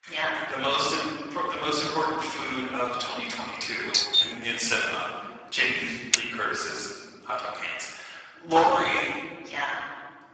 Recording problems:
off-mic speech; far
garbled, watery; badly; nothing above 8 kHz
thin; very; fading below 800 Hz
room echo; noticeable; dies away in 1.8 s
doorbell; loud; at 4 s; peak 7 dB above the speech
keyboard typing; very faint; at 6 s; peak 3 dB above the speech
door banging; loud; at 8.5 s; peak level with the speech

